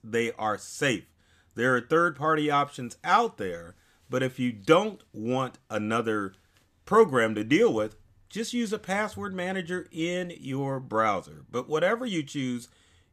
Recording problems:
none

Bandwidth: 14.5 kHz